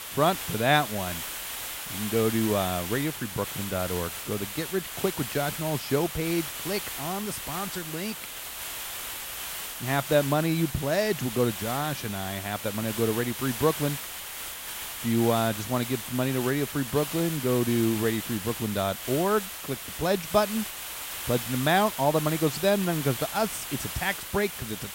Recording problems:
hiss; loud; throughout; 6 dB below the speech

